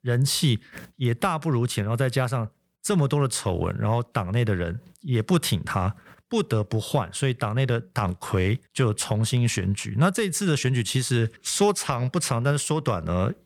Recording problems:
none

